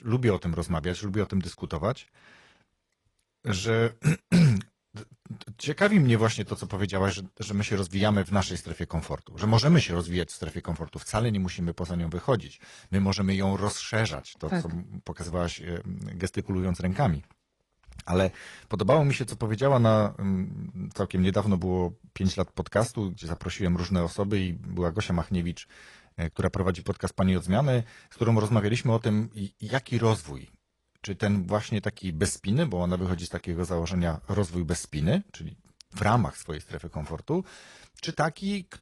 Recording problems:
garbled, watery; slightly; nothing above 11 kHz

